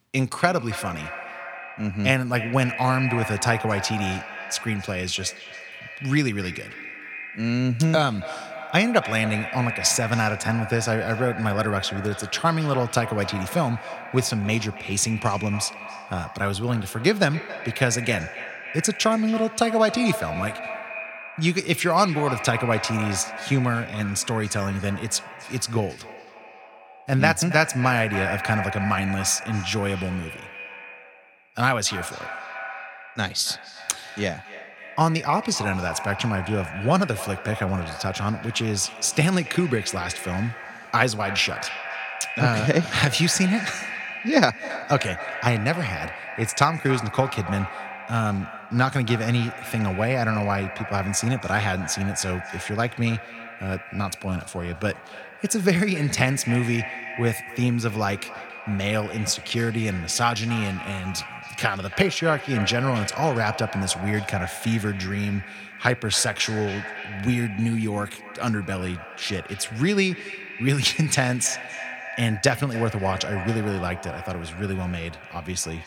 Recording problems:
echo of what is said; strong; throughout; 280 ms later, 10 dB below the speech

